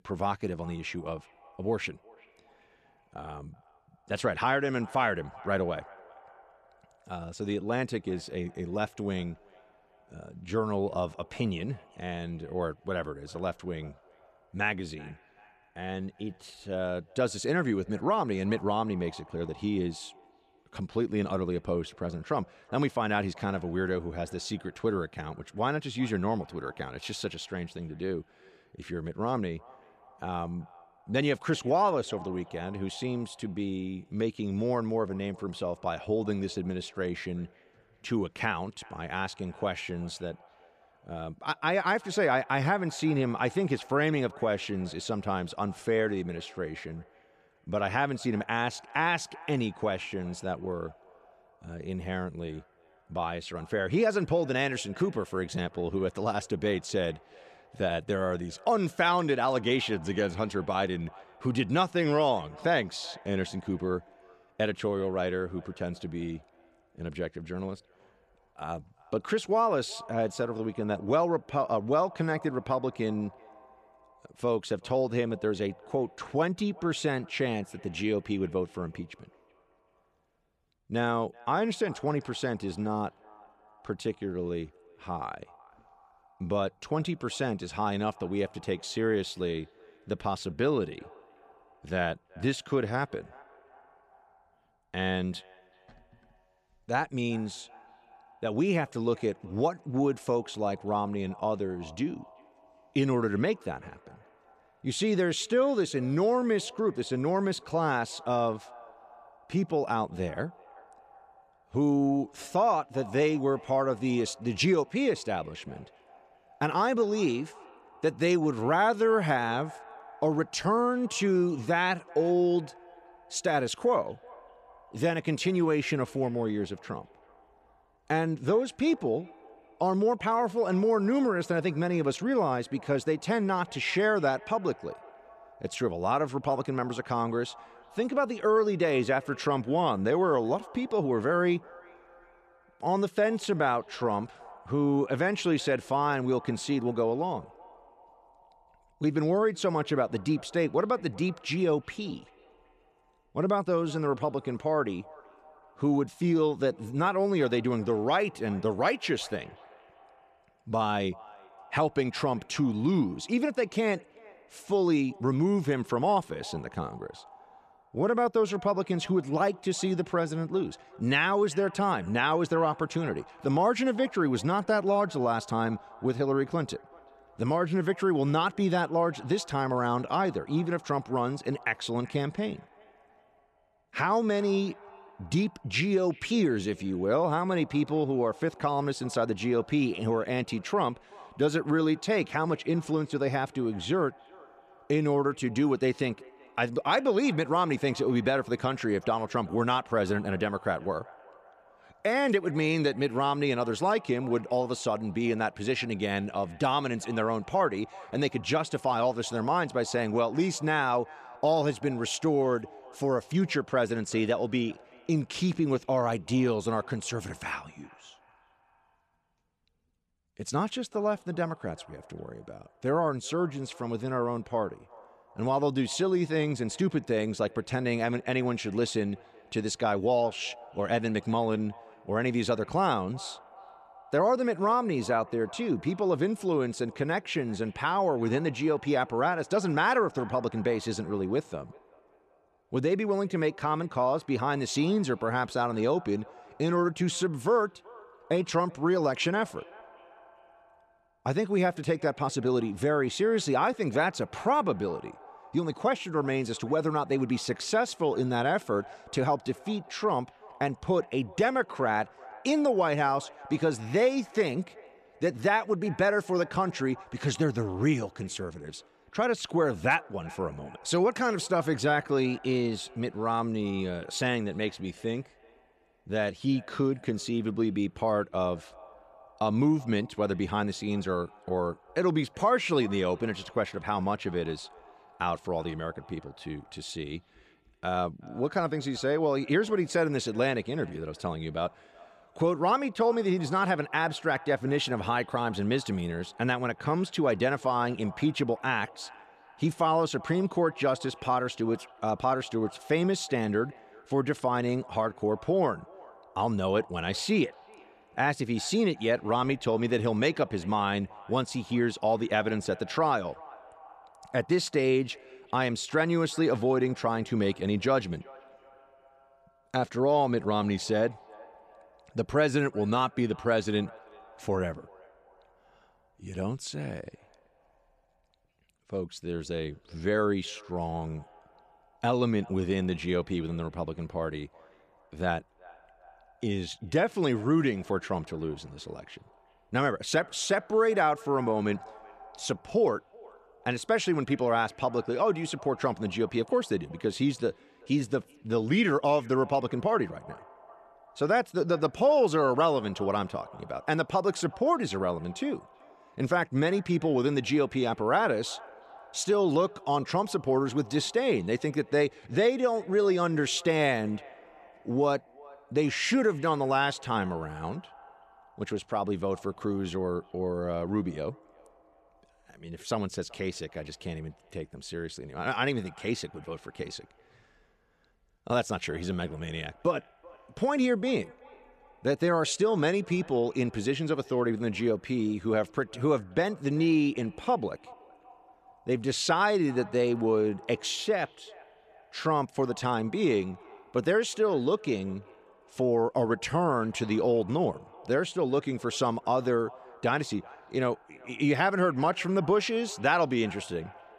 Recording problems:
echo of what is said; faint; throughout; 380 ms later, 25 dB below the speech

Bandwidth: 13.5 kHz